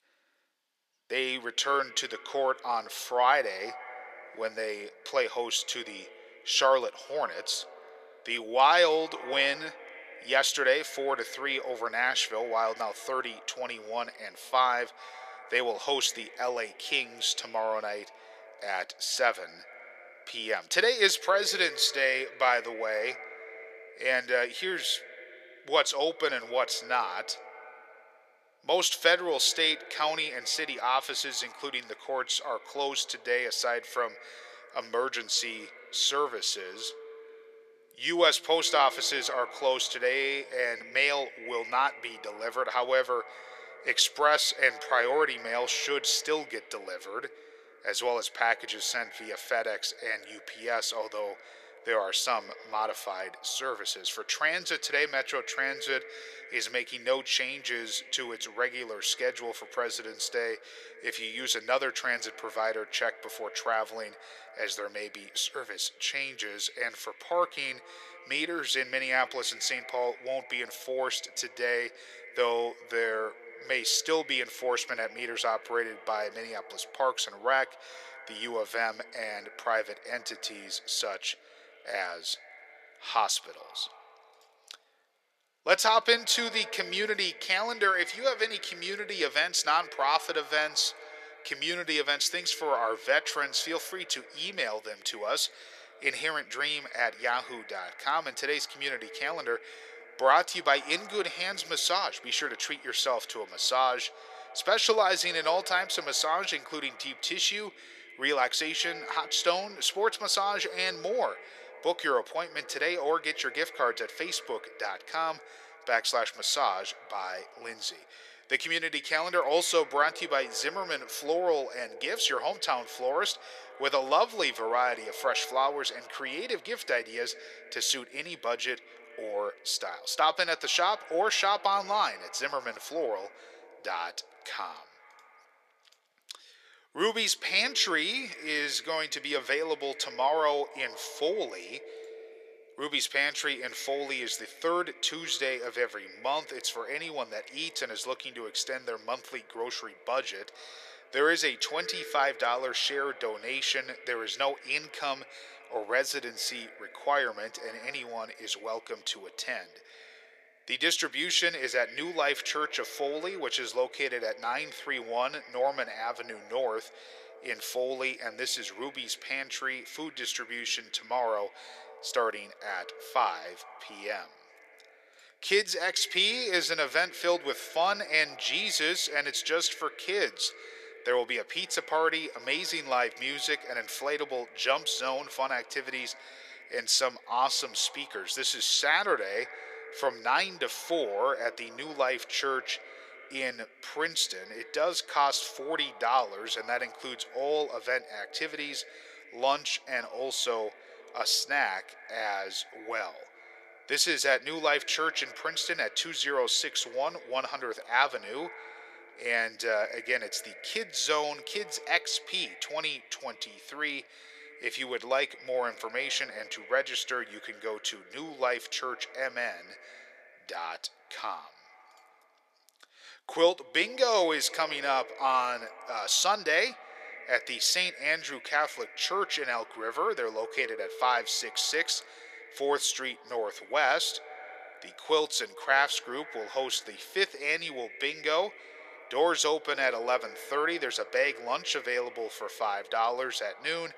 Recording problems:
thin; very; fading below 450 Hz
echo of what is said; faint; throughout; 200 ms later, 20 dB below the speech

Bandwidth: 14.5 kHz